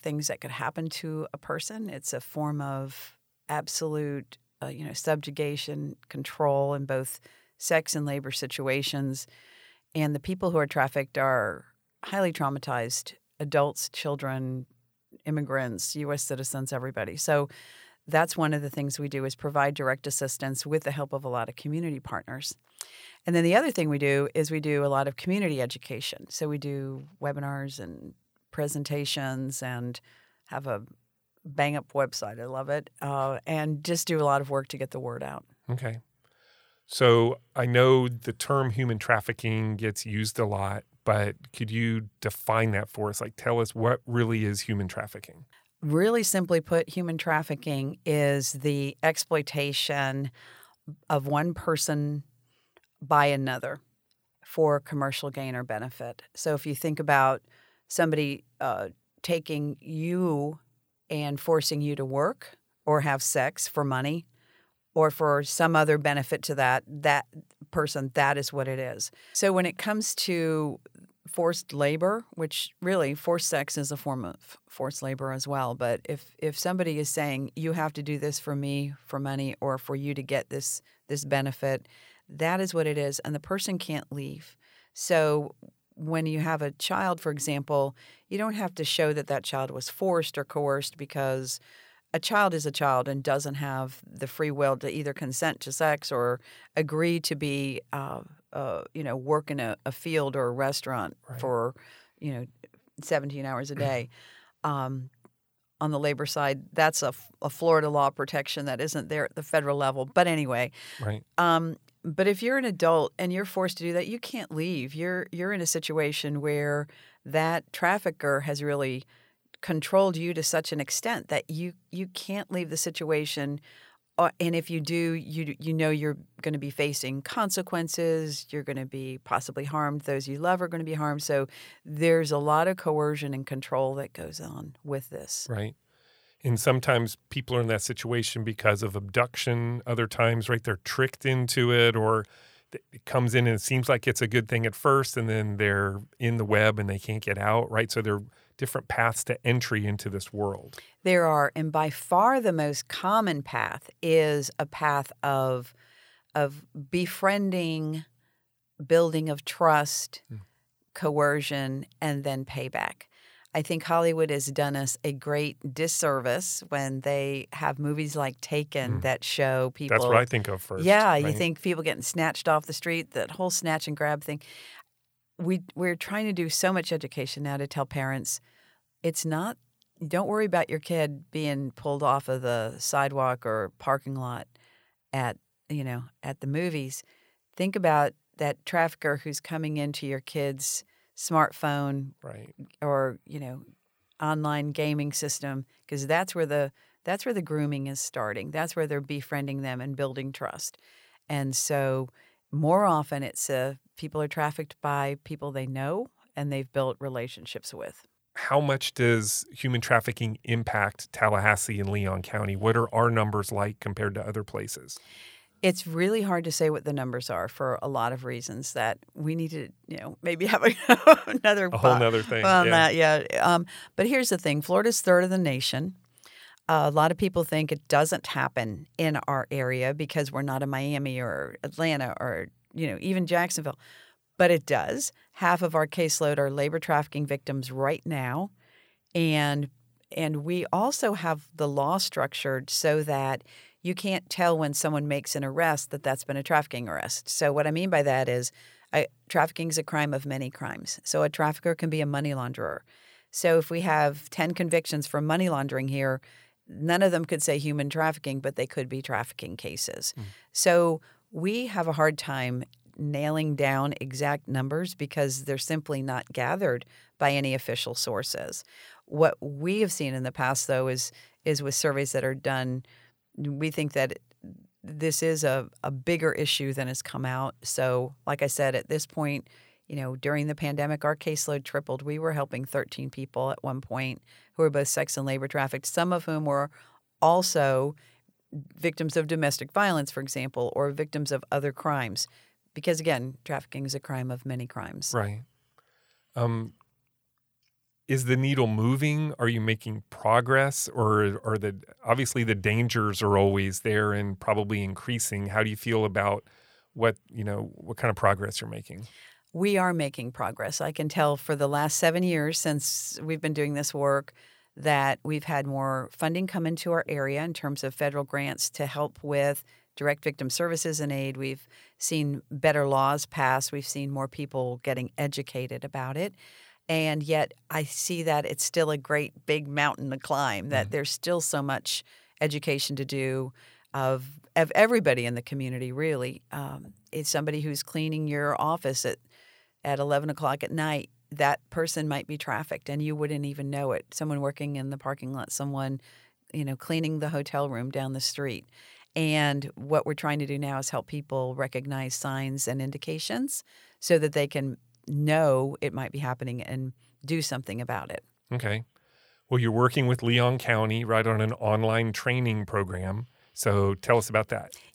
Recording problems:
none

